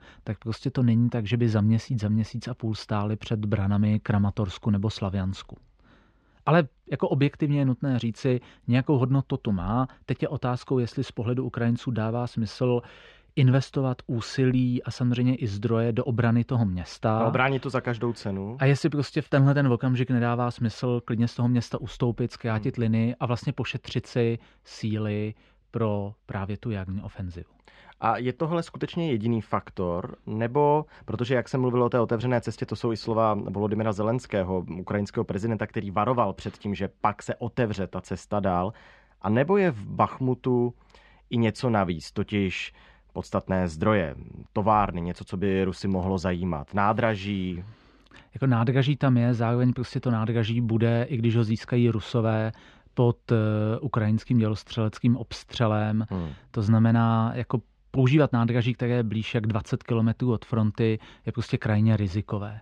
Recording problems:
muffled; slightly; fading above 3 kHz

